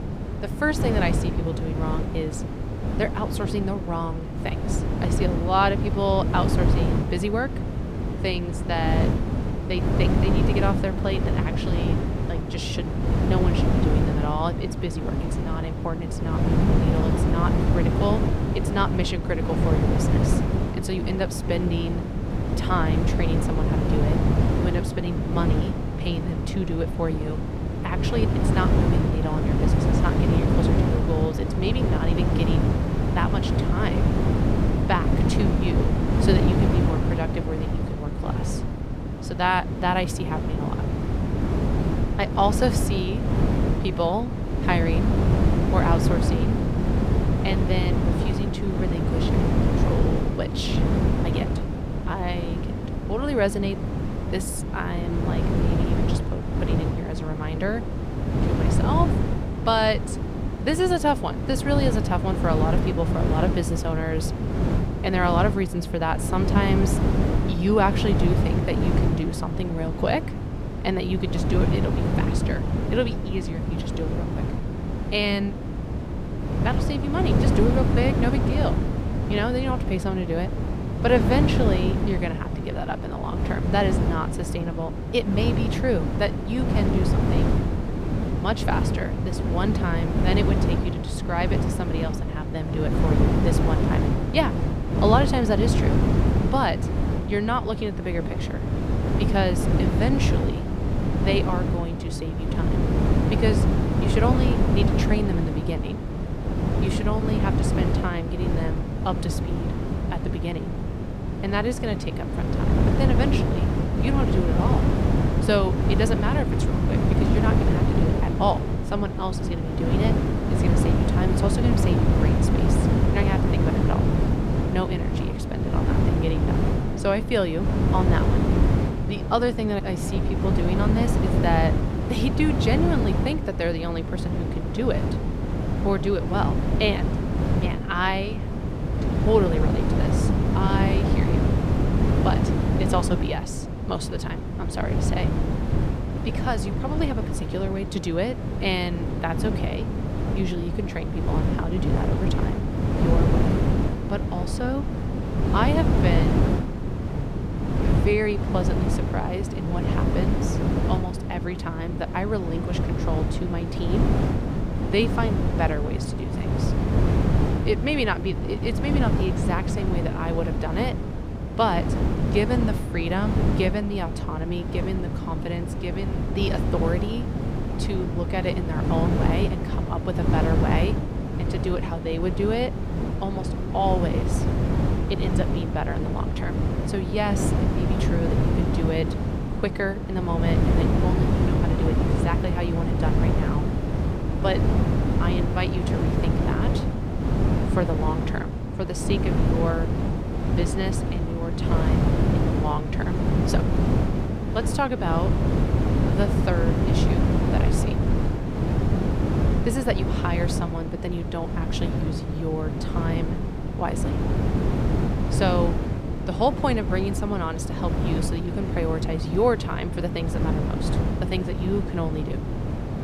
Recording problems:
wind noise on the microphone; heavy; 2 dB below the speech

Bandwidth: 15.5 kHz